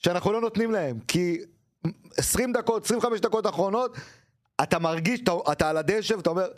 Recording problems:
squashed, flat; somewhat

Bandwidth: 14 kHz